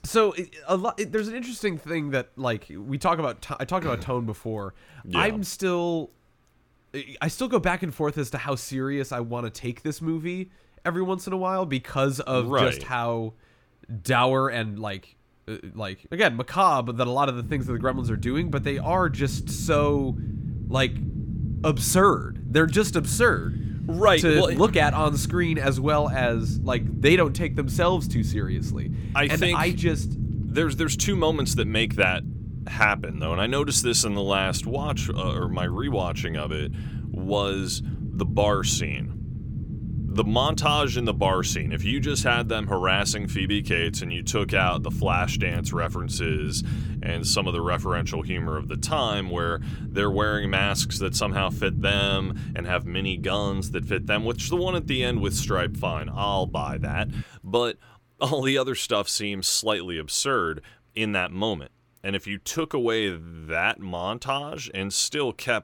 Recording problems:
low rumble; noticeable; from 17 to 57 s; 15 dB below the speech

